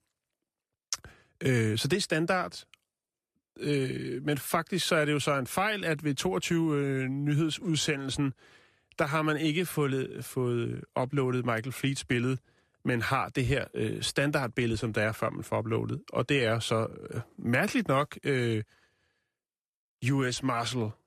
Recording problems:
none

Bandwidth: 14.5 kHz